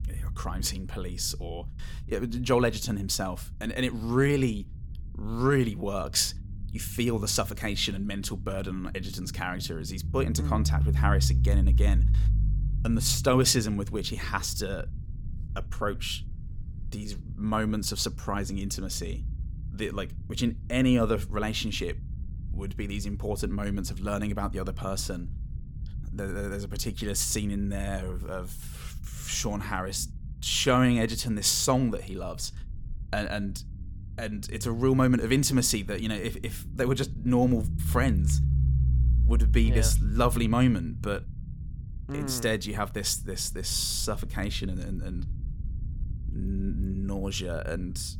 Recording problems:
low rumble; noticeable; throughout; 20 dB below the speech

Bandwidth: 17.5 kHz